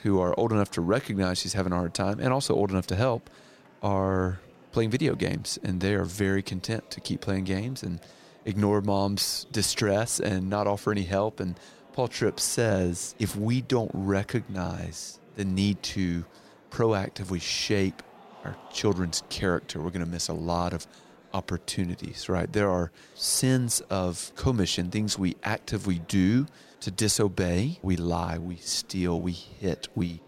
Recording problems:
murmuring crowd; faint; throughout; 25 dB below the speech

